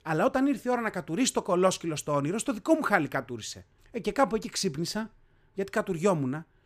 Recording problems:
none

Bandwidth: 15 kHz